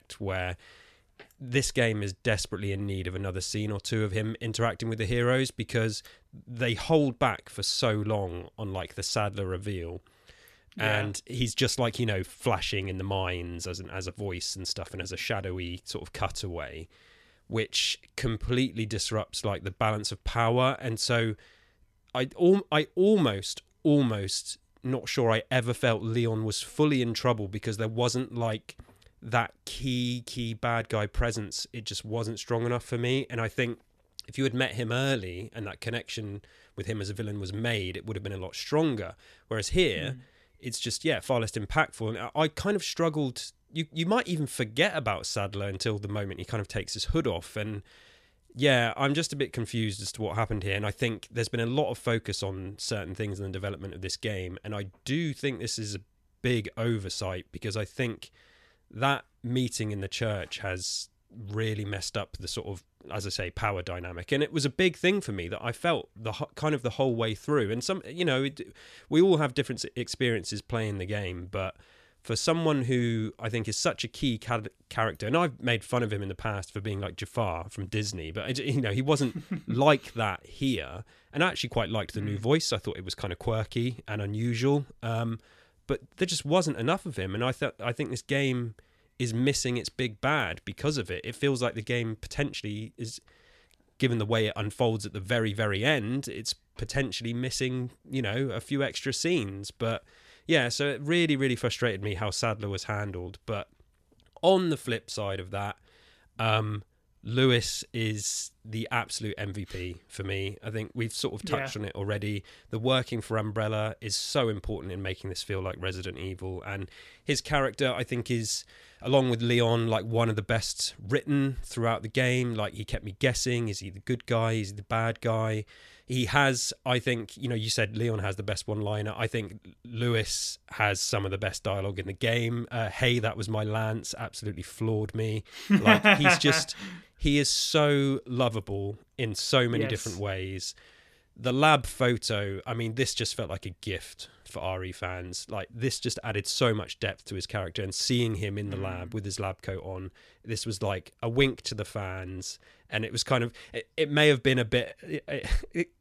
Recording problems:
none

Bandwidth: 14 kHz